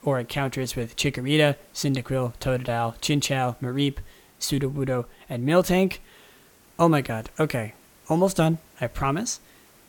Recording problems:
hiss; faint; throughout; 30 dB below the speech

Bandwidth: 18 kHz